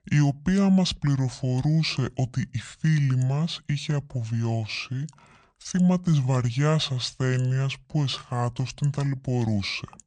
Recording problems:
wrong speed and pitch; too slow and too low; 0.7 times normal speed

